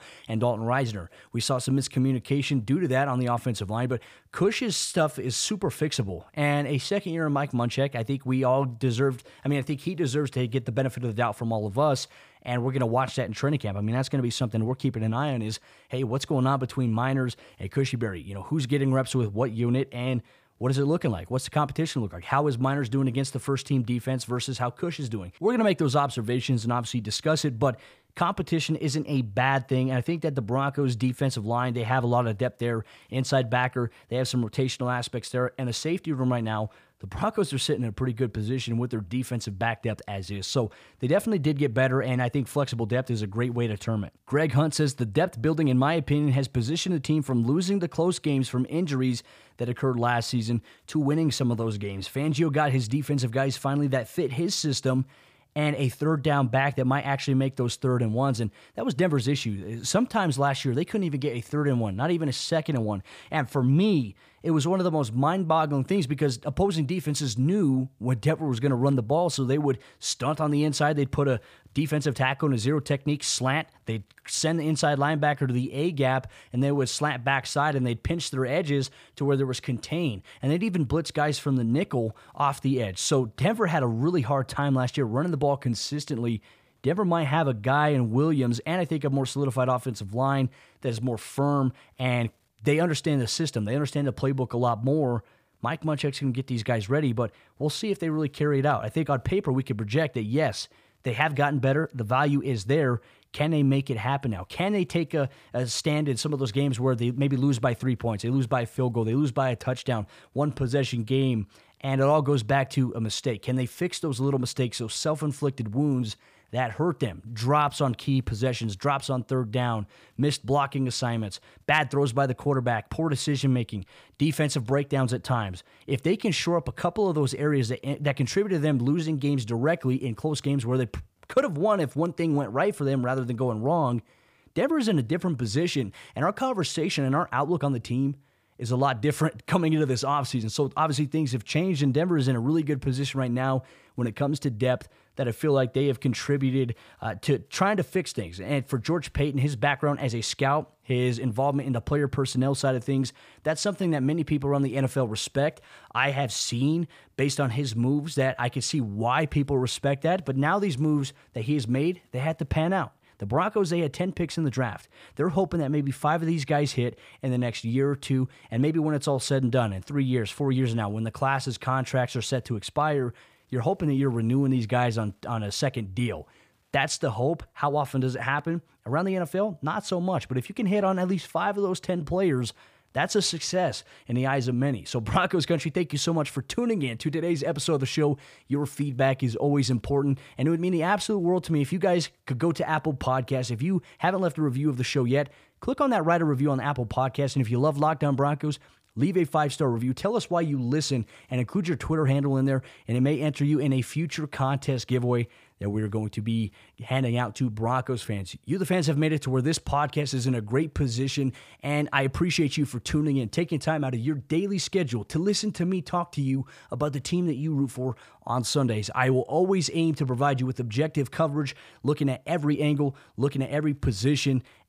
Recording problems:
none

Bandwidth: 15 kHz